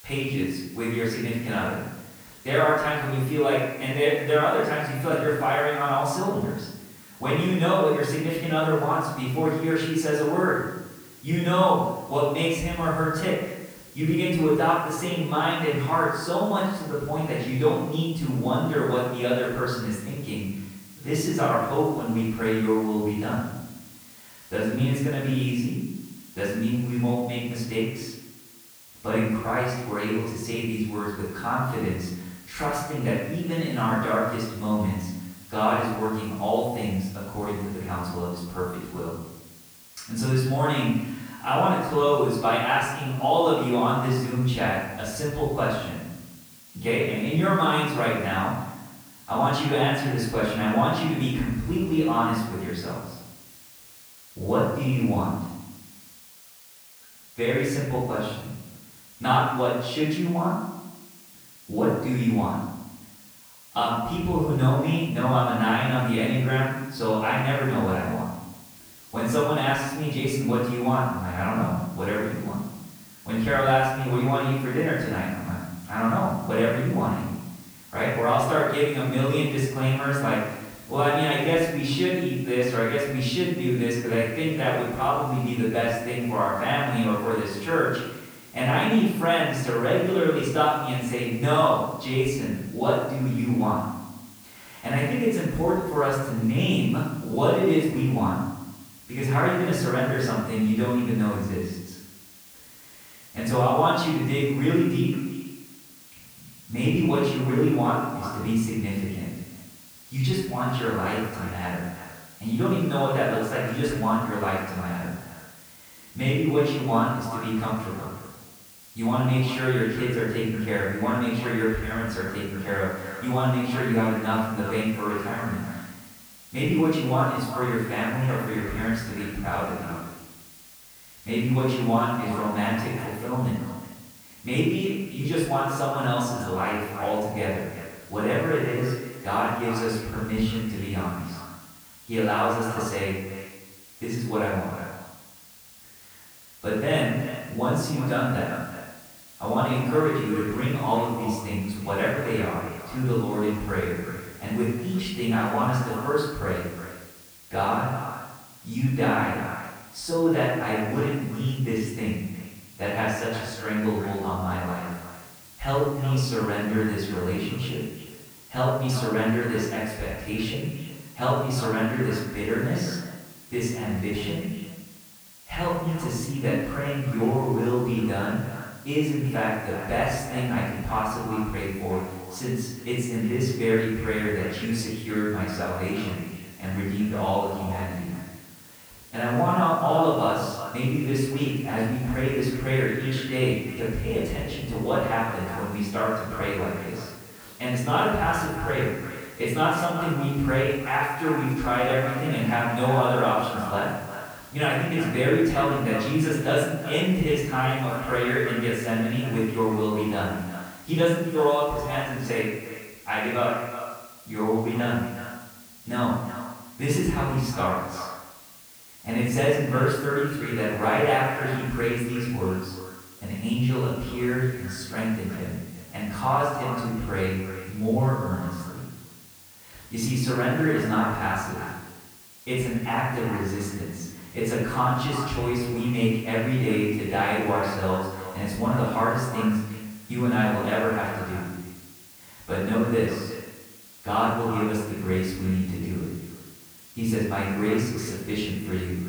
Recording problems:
off-mic speech; far
echo of what is said; noticeable; from 1:45 on; 360 ms later, 15 dB below the speech
room echo; noticeable; dies away in 0.9 s
hiss; faint; throughout; 20 dB below the speech

